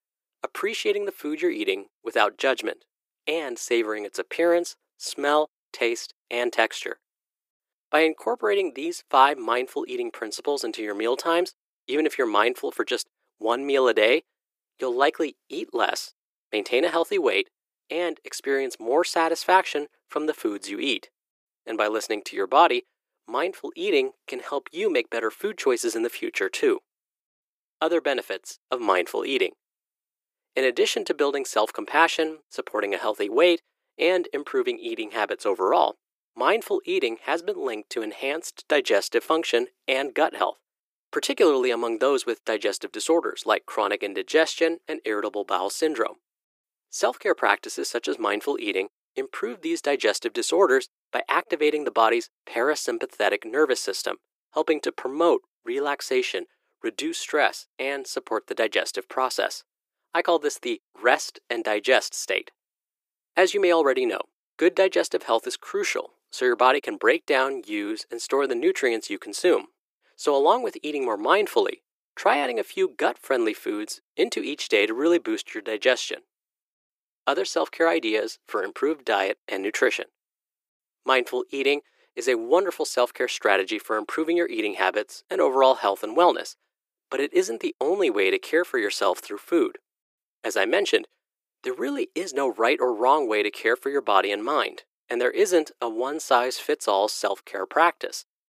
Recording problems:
thin; very; fading below 350 Hz

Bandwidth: 15 kHz